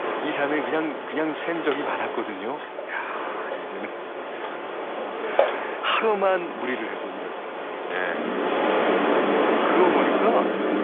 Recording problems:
phone-call audio; nothing above 3.5 kHz
wind in the background; very loud; throughout; 1 dB above the speech

